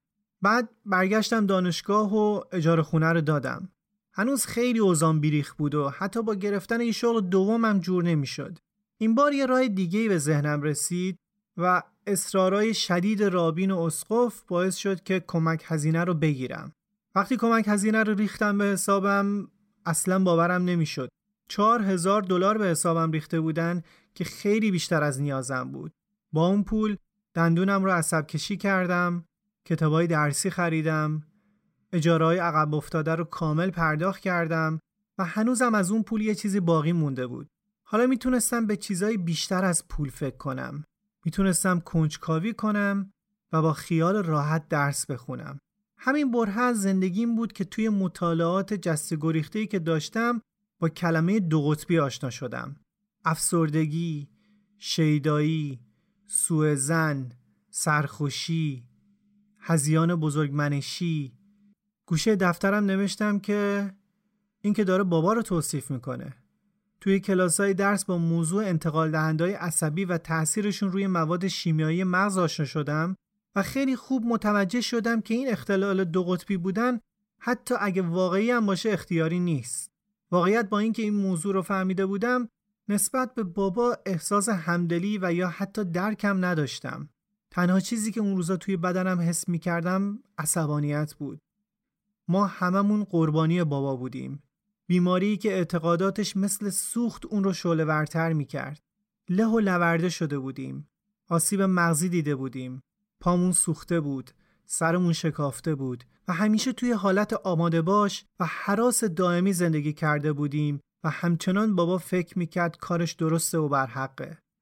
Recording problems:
none

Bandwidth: 16 kHz